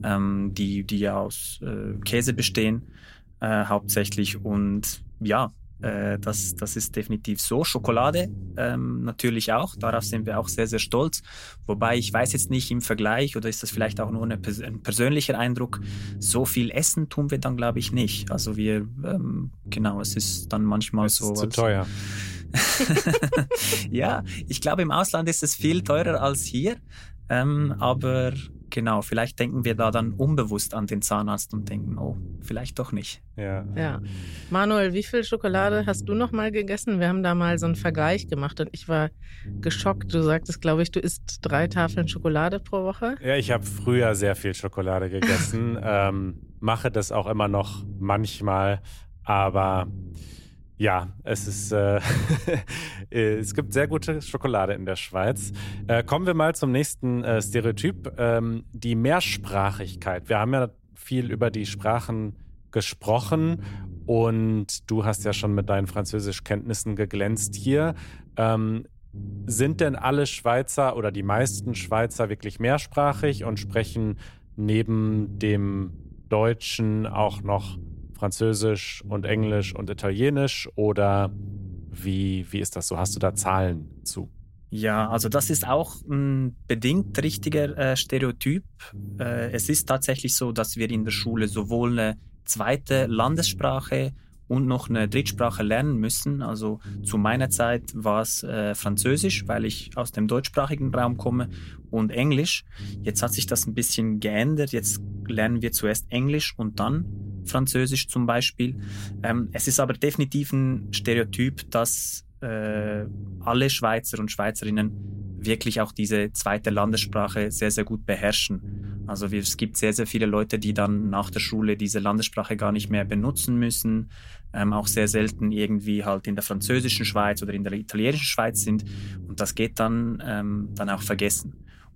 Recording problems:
low rumble; faint; throughout; 20 dB below the speech

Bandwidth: 16 kHz